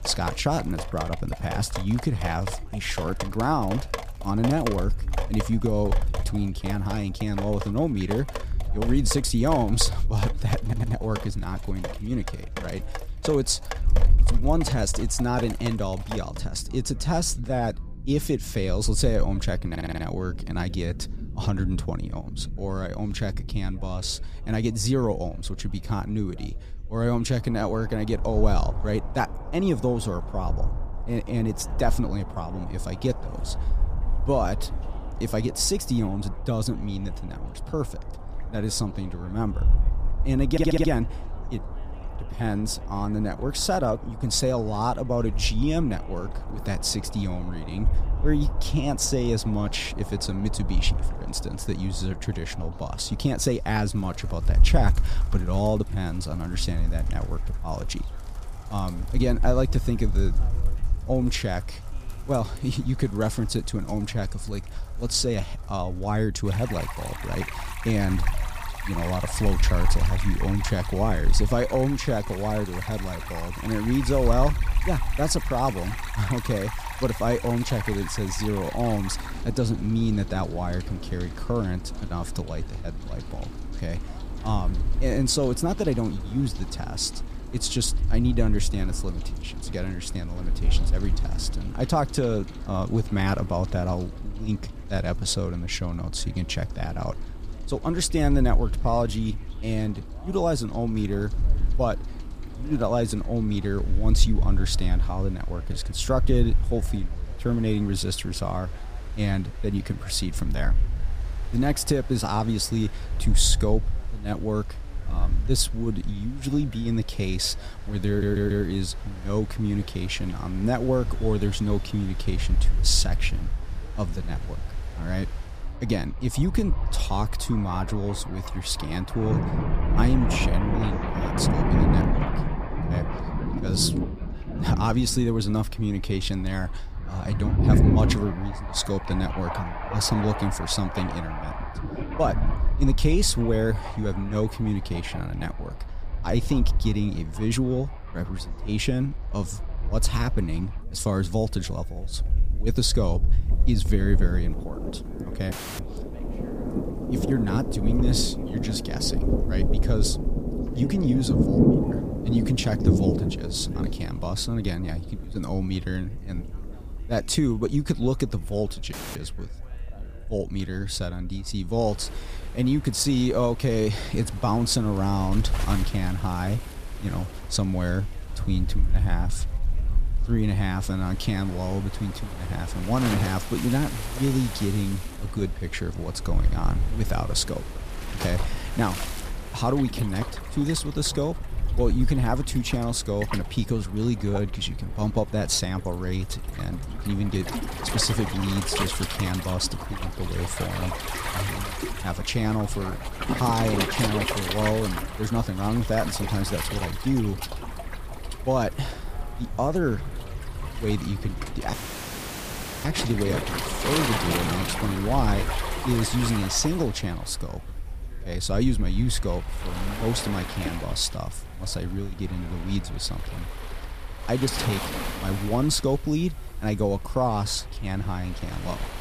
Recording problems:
rain or running water; loud; throughout; 6 dB below the speech
wind noise on the microphone; occasional gusts; 25 dB below the speech
background chatter; faint; throughout; 3 voices, 25 dB below the speech
audio stuttering; 4 times, first at 11 s
audio cutting out; filled with static; at 2:36, at 2:49 and at 3:32 for 1 s

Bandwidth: 15 kHz